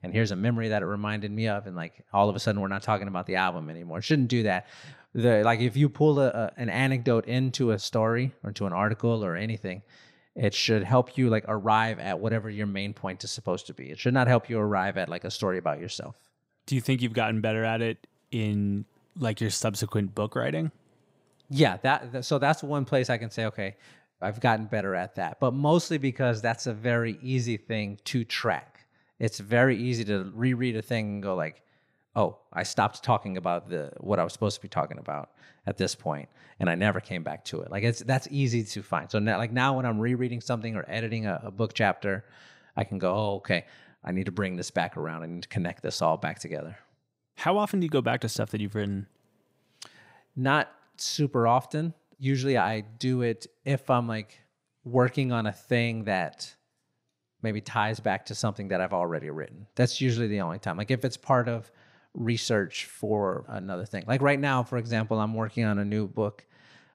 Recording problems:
none

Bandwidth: 15.5 kHz